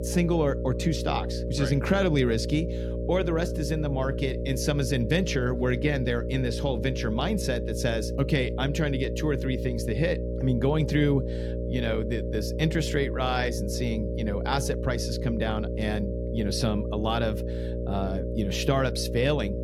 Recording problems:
electrical hum; loud; throughout; 60 Hz, 6 dB below the speech

